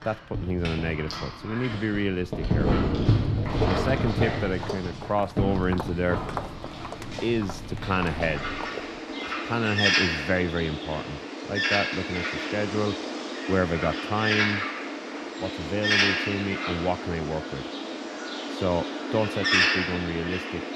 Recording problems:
animal sounds; very loud; throughout; 1 dB above the speech
footsteps; noticeable; from 3.5 to 9 s; peak 6 dB below the speech

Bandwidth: 14 kHz